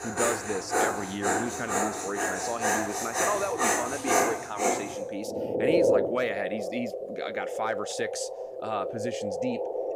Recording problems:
animal sounds; very loud; throughout; 5 dB above the speech

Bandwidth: 15.5 kHz